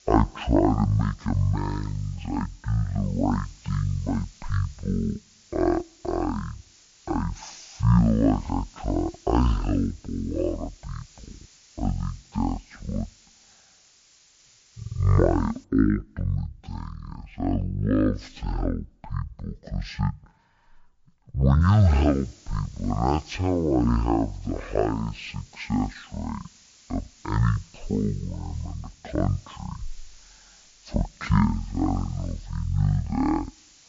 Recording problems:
wrong speed and pitch; too slow and too low; 0.5 times normal speed
hiss; faint; until 16 s and from 22 s on; 25 dB below the speech

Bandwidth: 7.5 kHz